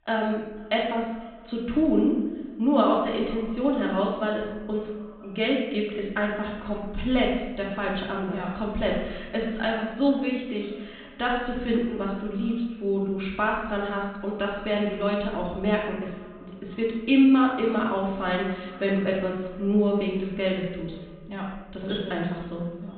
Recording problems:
off-mic speech; far
high frequencies cut off; severe; nothing above 4 kHz
room echo; noticeable; dies away in 0.9 s
echo of what is said; faint; throughout; 490 ms later, 25 dB below the speech

